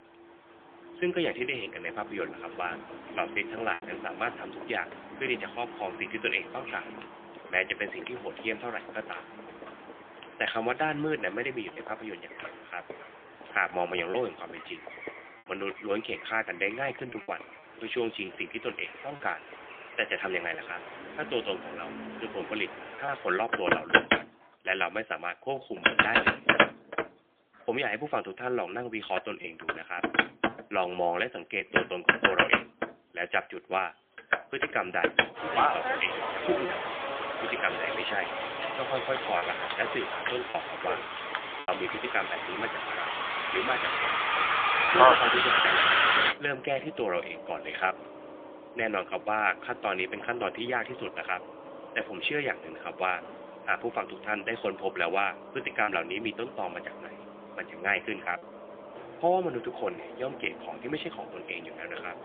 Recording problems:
phone-call audio; poor line; nothing above 3.5 kHz
traffic noise; very loud; throughout; 5 dB above the speech
choppy; occasionally; 1% of the speech affected

